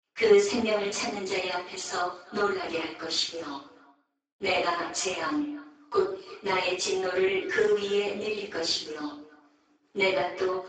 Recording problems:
off-mic speech; far
garbled, watery; badly; nothing above 7.5 kHz
room echo; noticeable; dies away in 0.5 s
thin; somewhat; fading below 300 Hz
echo of what is said; faint; throughout; 340 ms later, 20 dB below the speech

